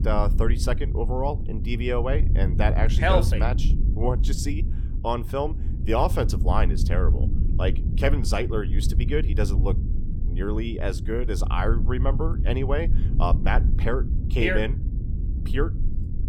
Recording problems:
low rumble; noticeable; throughout; 10 dB below the speech

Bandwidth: 18.5 kHz